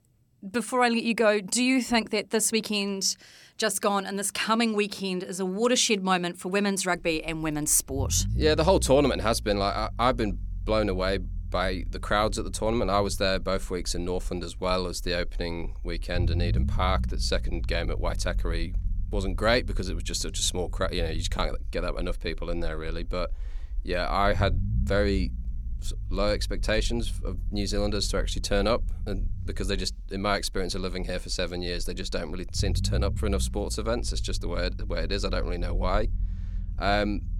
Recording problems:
low rumble; faint; from 7 s on; 20 dB below the speech

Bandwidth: 17.5 kHz